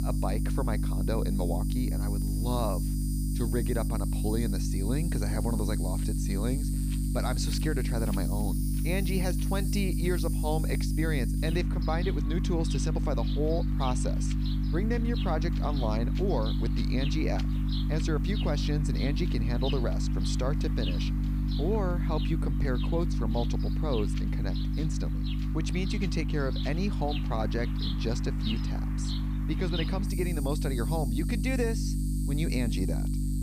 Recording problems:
electrical hum; loud; throughout; 50 Hz, 5 dB below the speech
animal sounds; loud; throughout; 10 dB below the speech
wind noise on the microphone; occasional gusts; from 6.5 to 27 s; 20 dB below the speech
hiss; faint; throughout; 30 dB below the speech

